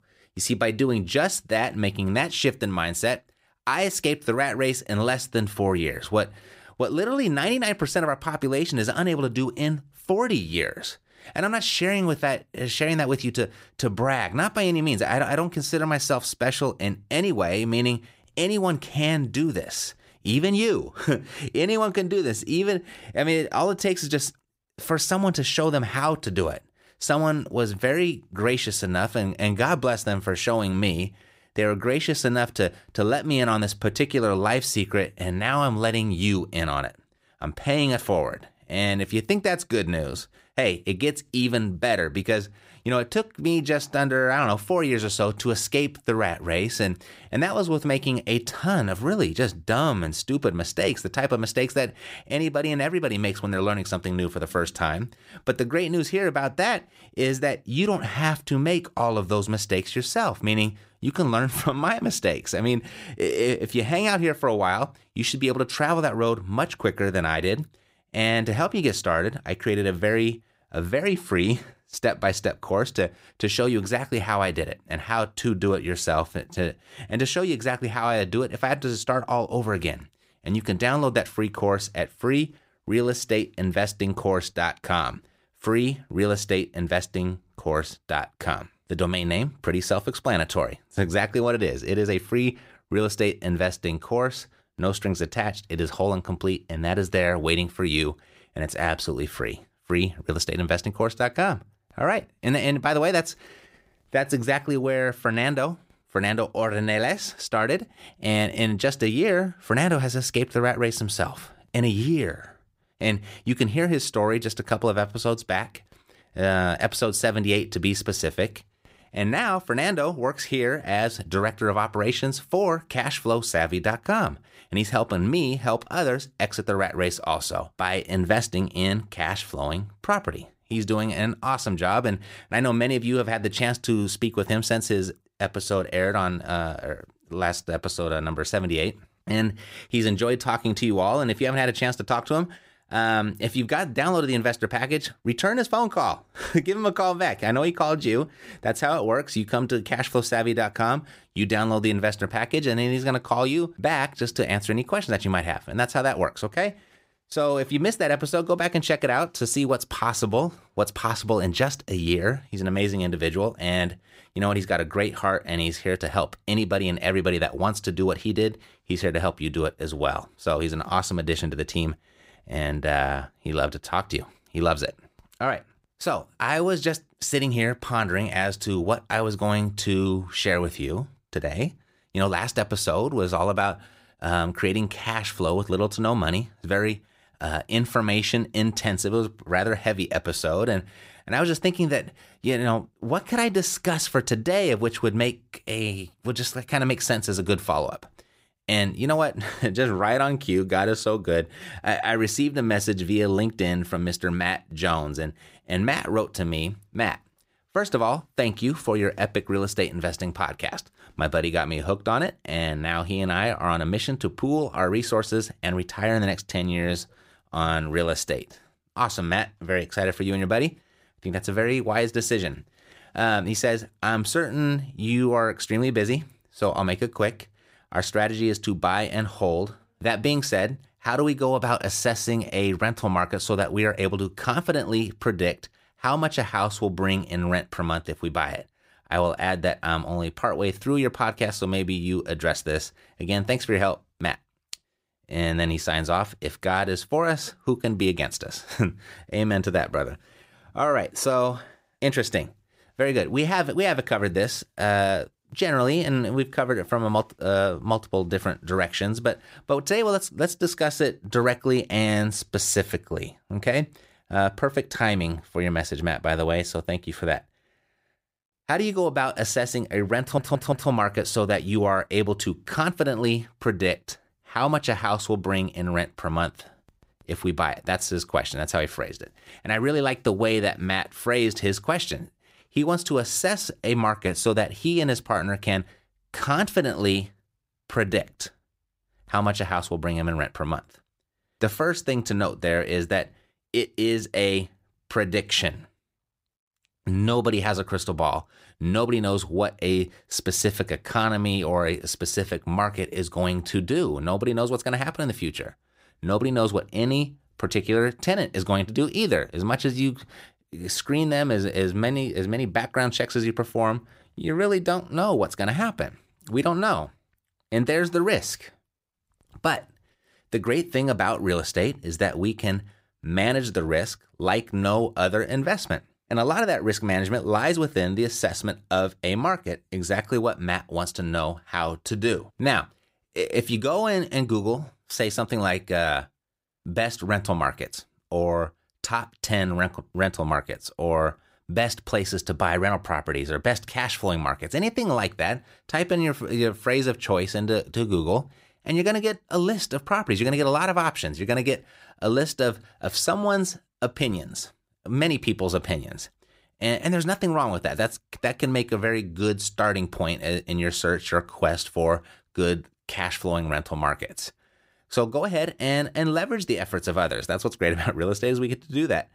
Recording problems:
audio stuttering; at 4:30

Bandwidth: 15.5 kHz